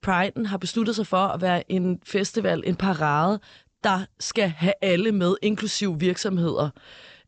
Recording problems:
high frequencies cut off; noticeable; nothing above 8 kHz

